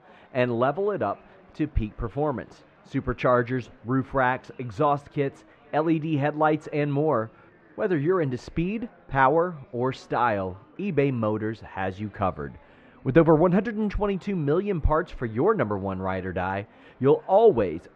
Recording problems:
muffled; very; fading above 1.5 kHz
murmuring crowd; faint; throughout; 30 dB below the speech

